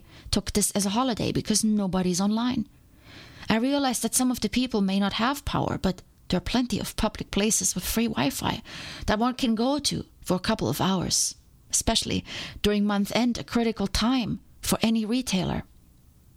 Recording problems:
squashed, flat; somewhat

